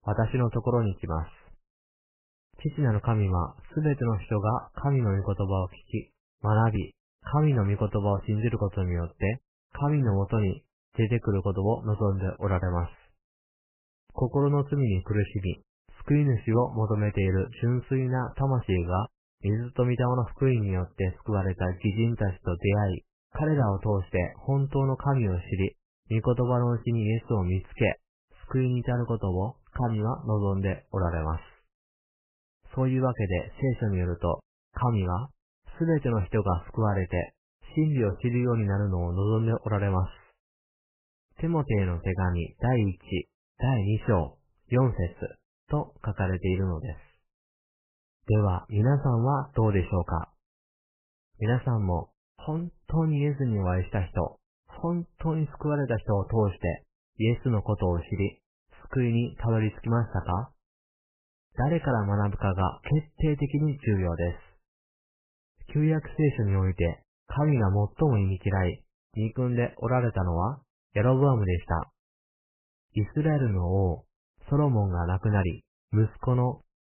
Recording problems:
garbled, watery; badly; nothing above 3 kHz

